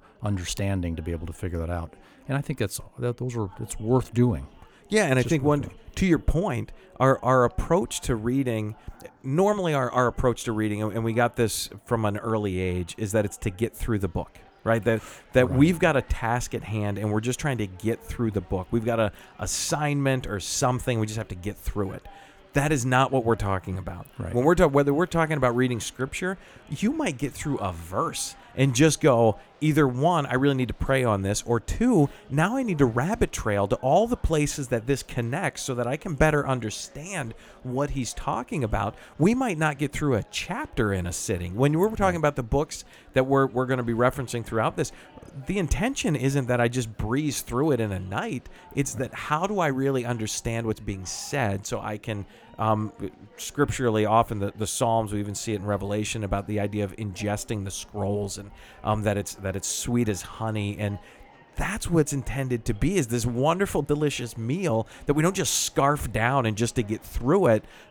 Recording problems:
chatter from many people; faint; throughout; 30 dB below the speech

